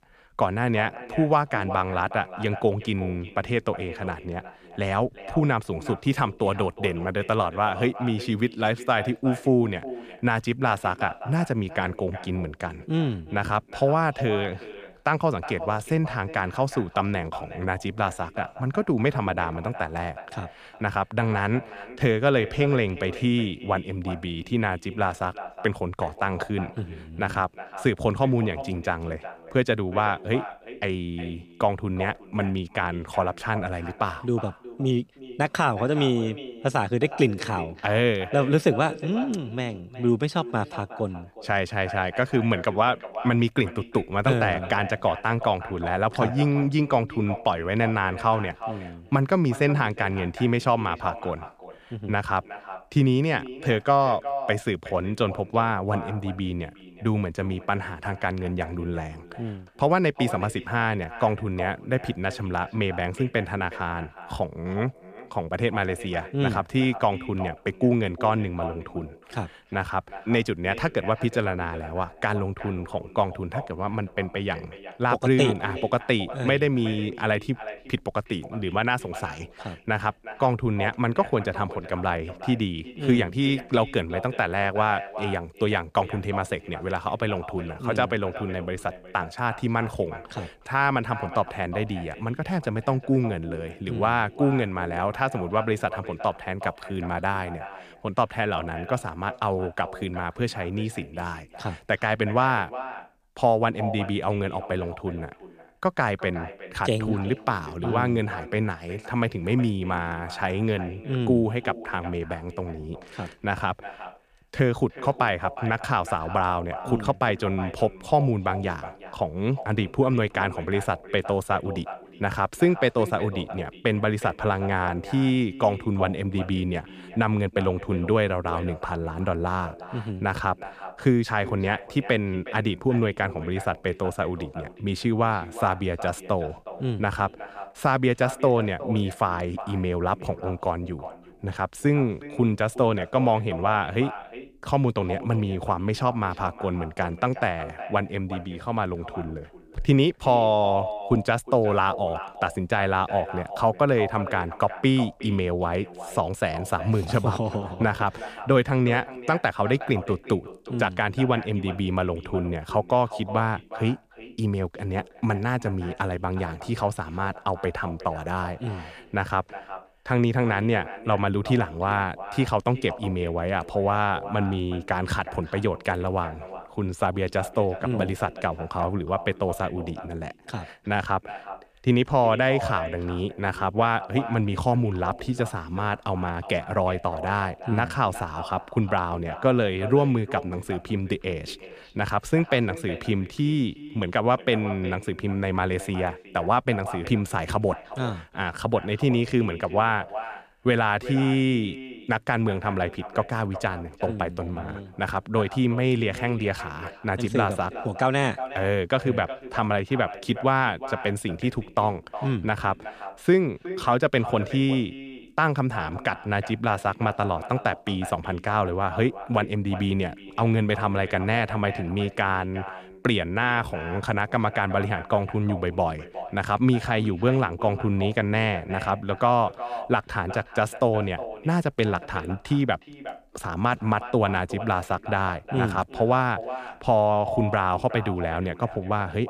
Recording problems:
echo of what is said; noticeable; throughout; 360 ms later, 15 dB below the speech

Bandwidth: 14.5 kHz